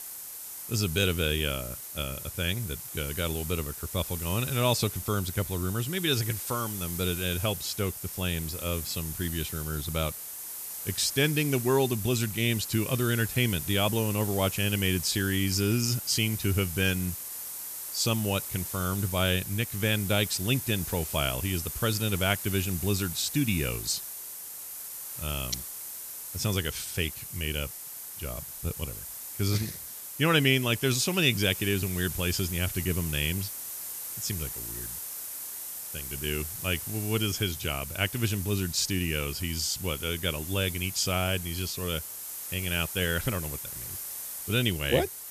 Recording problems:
hiss; loud; throughout; 7 dB below the speech

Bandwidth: 14.5 kHz